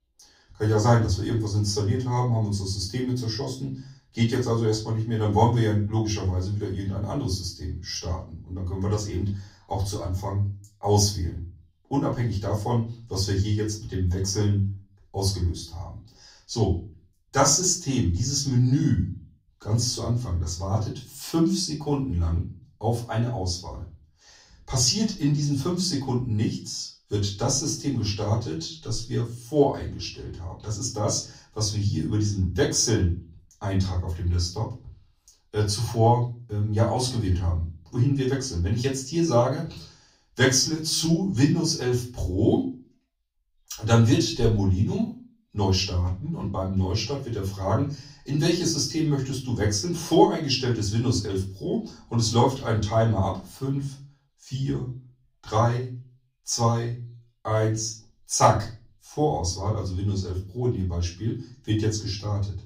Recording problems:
off-mic speech; far
room echo; slight; dies away in 0.3 s

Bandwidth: 15.5 kHz